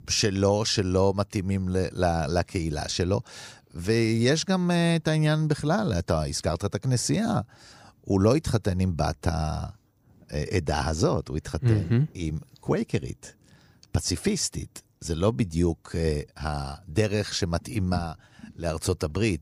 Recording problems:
none

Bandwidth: 15 kHz